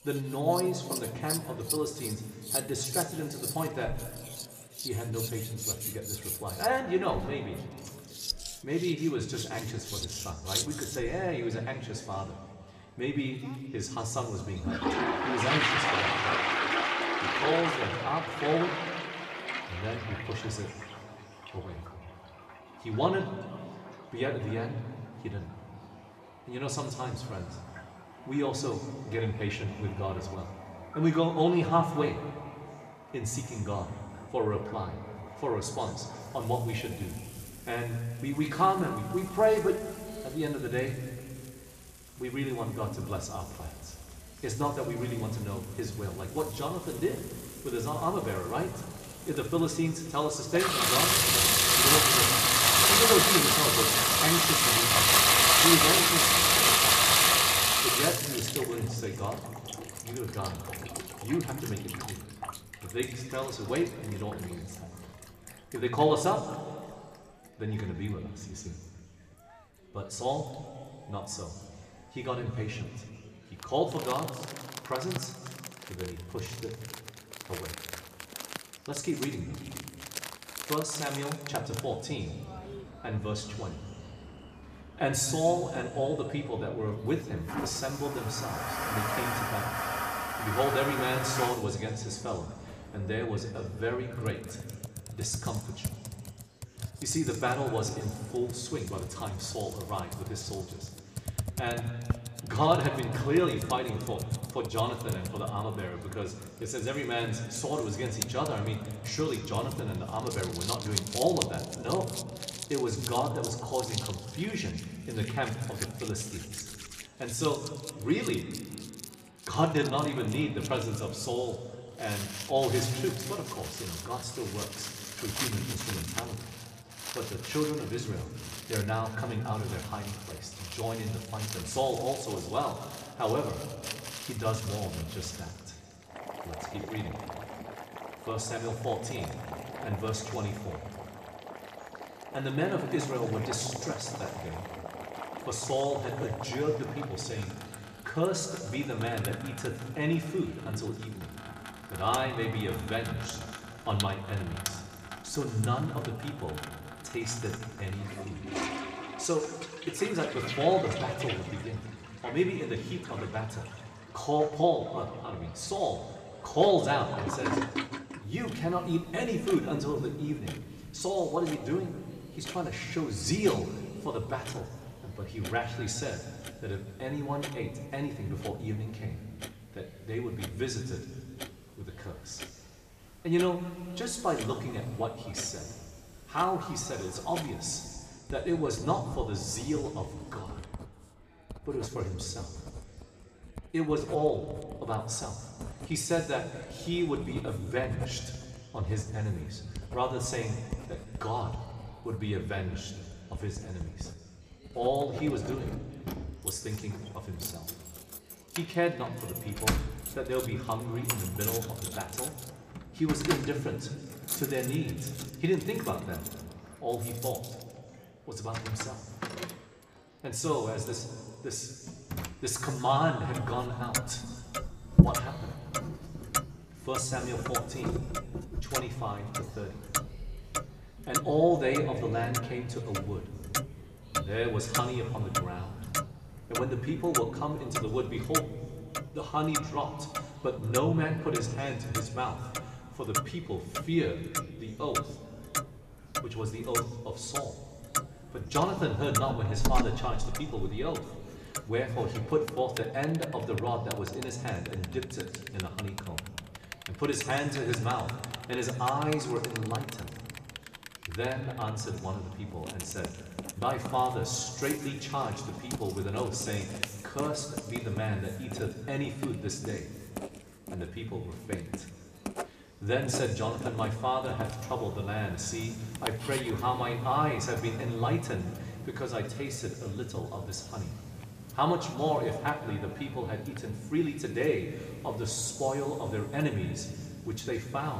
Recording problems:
room echo; slight; dies away in 2 s
off-mic speech; somewhat distant
household noises; very loud; throughout; 2 dB above the speech
murmuring crowd; faint; throughout; 25 dB below the speech
abrupt cut into speech; at the end

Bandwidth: 14.5 kHz